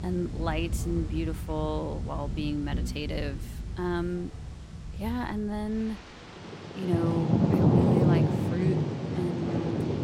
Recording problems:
rain or running water; very loud; throughout; 4 dB above the speech

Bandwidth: 16 kHz